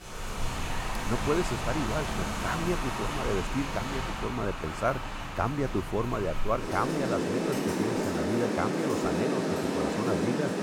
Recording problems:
rain or running water; very loud; throughout; 1 dB above the speech

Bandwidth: 17.5 kHz